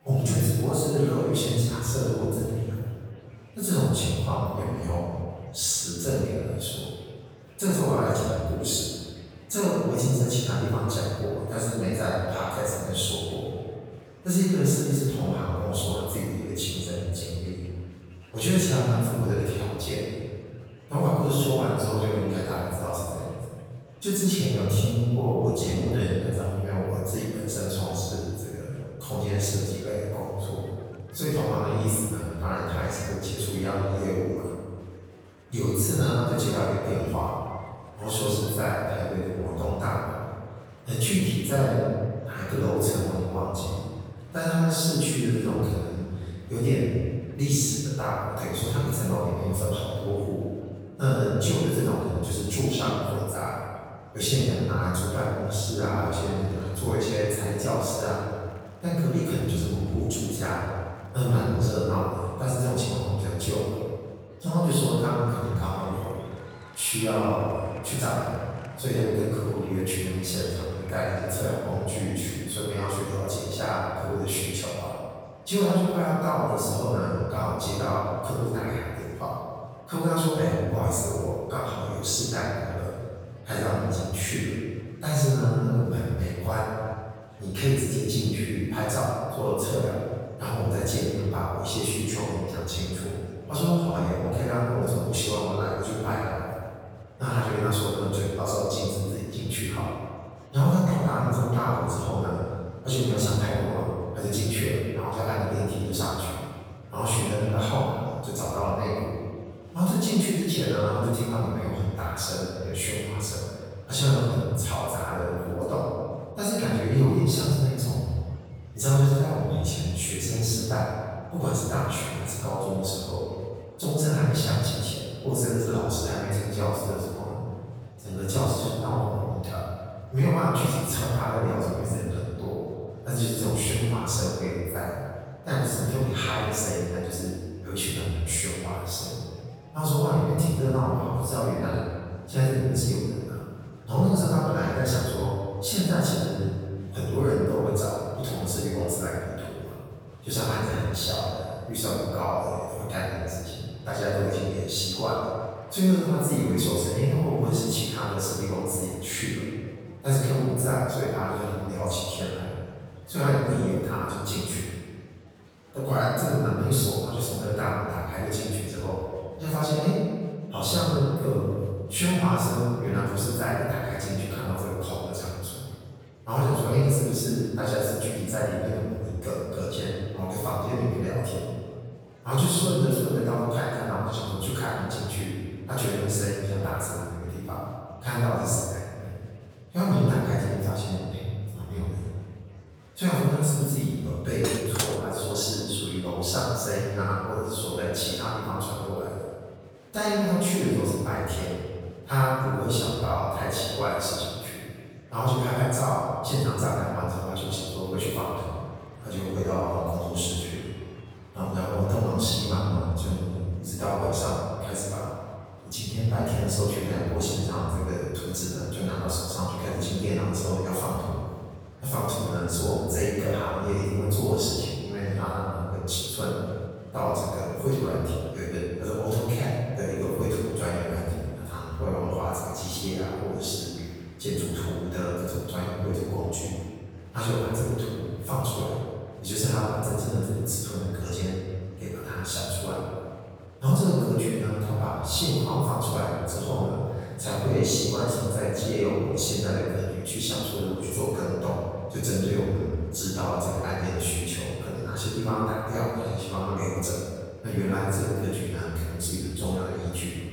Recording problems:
room echo; strong; dies away in 1.6 s
off-mic speech; far
murmuring crowd; faint; throughout; 25 dB below the speech
clattering dishes; noticeable; at 3:14; peak 2 dB below the speech

